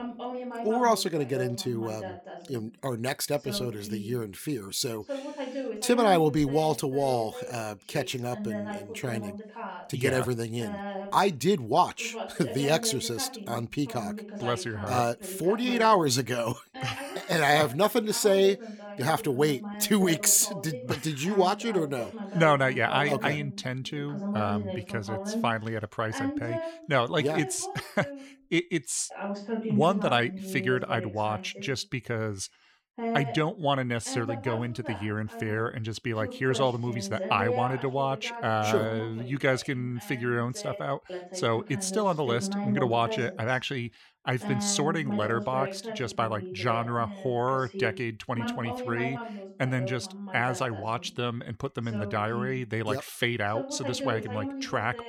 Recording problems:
voice in the background; loud; throughout; 9 dB below the speech

